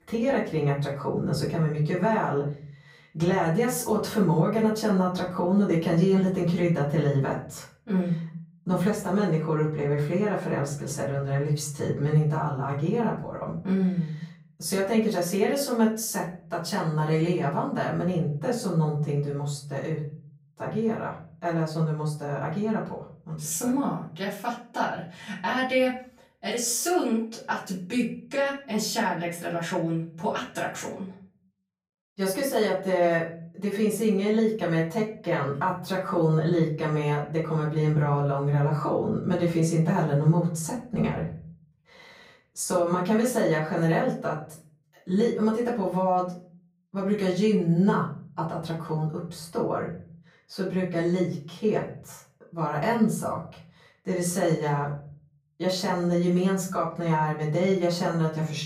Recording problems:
off-mic speech; far
room echo; slight; dies away in 0.6 s

